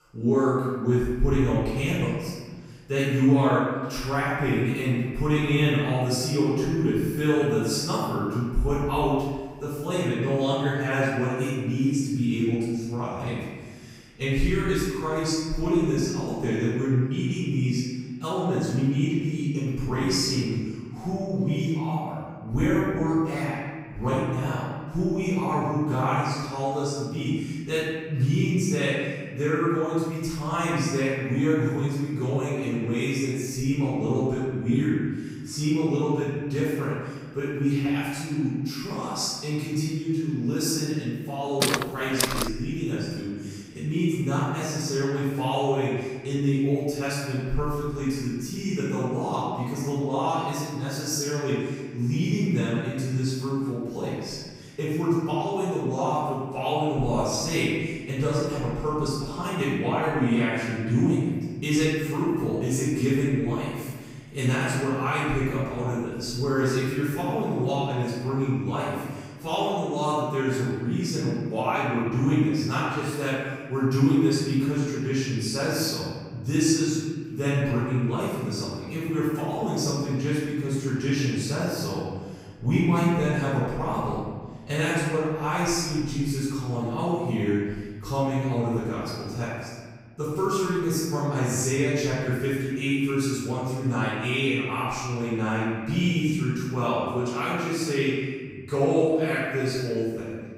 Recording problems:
room echo; strong; dies away in 1.6 s
off-mic speech; far
footsteps; loud; at 42 s; peak 1 dB above the speech

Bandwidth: 15.5 kHz